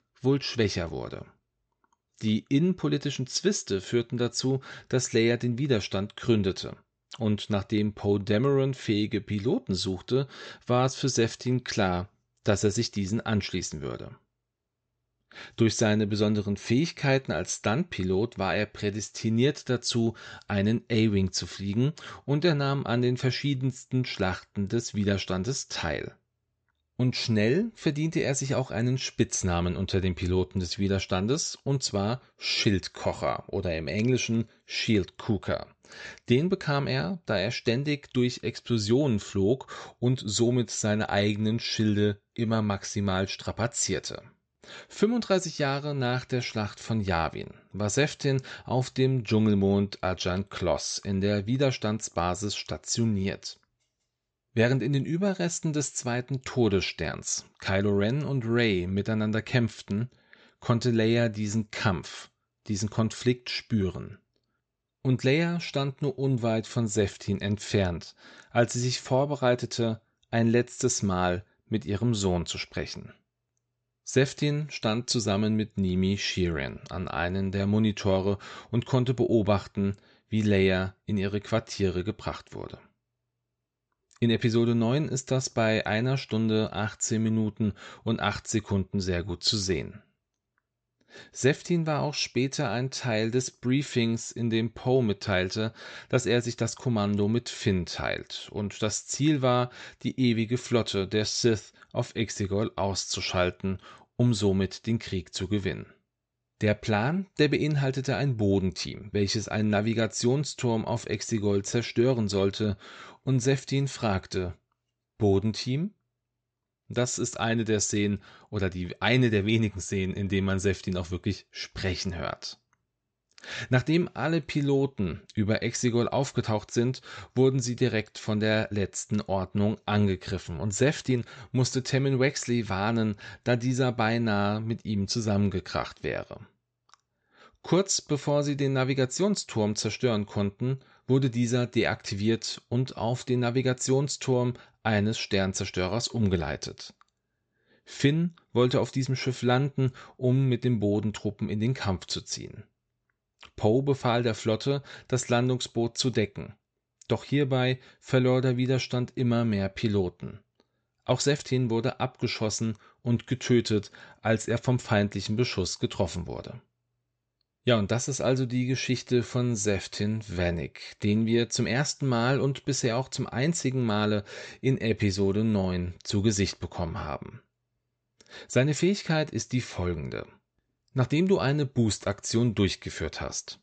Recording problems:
high frequencies cut off; noticeable; nothing above 8 kHz
uneven, jittery; strongly; from 57 s to 2:42

